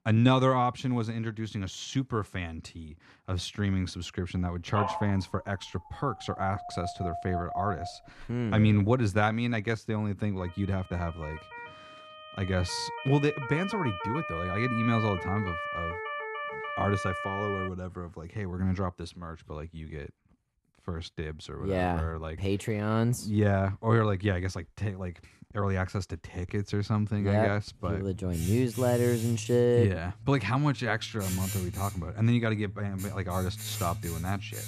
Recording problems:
household noises; loud; throughout; 9 dB below the speech
dog barking; noticeable; from 4.5 to 8.5 s; peak 3 dB below the speech
siren; noticeable; from 10 to 18 s; peak 2 dB below the speech

